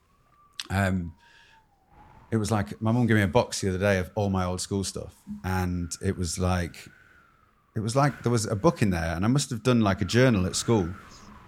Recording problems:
wind noise on the microphone; occasional gusts; 25 dB below the speech

